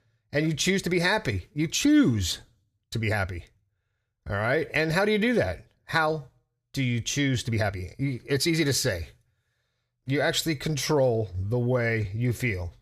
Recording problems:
uneven, jittery; strongly; from 1 to 12 s

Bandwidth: 15 kHz